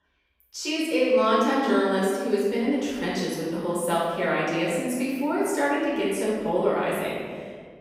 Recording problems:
room echo; strong; dies away in 1.7 s
off-mic speech; far

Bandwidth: 15.5 kHz